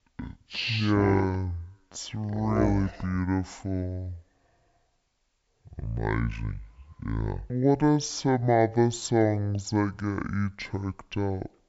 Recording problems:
wrong speed and pitch; too slow and too low; 0.6 times normal speed

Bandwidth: 7.5 kHz